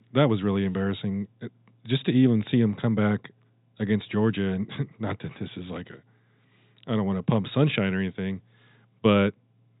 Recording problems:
high frequencies cut off; severe; nothing above 4 kHz

